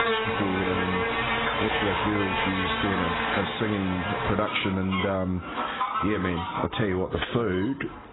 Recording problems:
garbled, watery; badly; nothing above 4 kHz
squashed, flat; somewhat, background pumping
animal sounds; very loud; throughout; as loud as the speech

